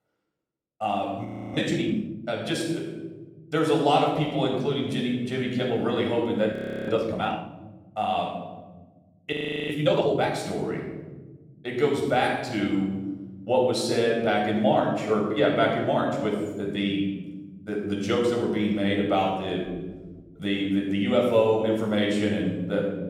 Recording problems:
room echo; noticeable; dies away in 1.7 s
off-mic speech; somewhat distant
audio freezing; at 1.5 s, at 6.5 s and at 9.5 s

